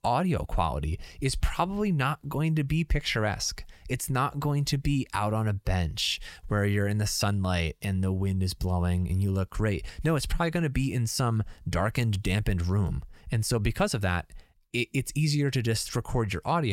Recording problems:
abrupt cut into speech; at the end

